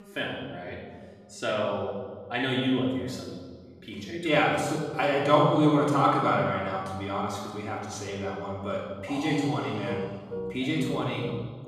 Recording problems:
off-mic speech; far
room echo; noticeable; dies away in 1.4 s
background music; noticeable; throughout; 15 dB below the speech

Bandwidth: 14.5 kHz